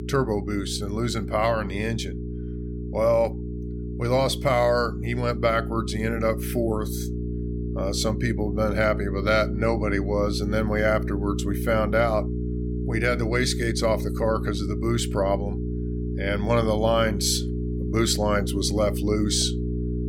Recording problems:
electrical hum; noticeable; throughout; 60 Hz, 10 dB below the speech

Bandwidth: 16.5 kHz